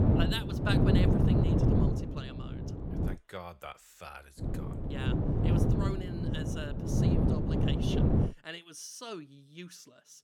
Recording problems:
wind noise on the microphone; heavy; until 3 s and from 4.5 to 8.5 s; 5 dB above the speech

